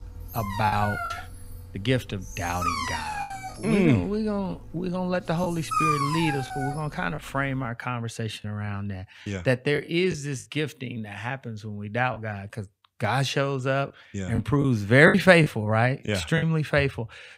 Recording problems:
choppy; occasionally; 4% of the speech affected
dog barking; loud; until 7 s; peak 2 dB above the speech

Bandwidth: 15.5 kHz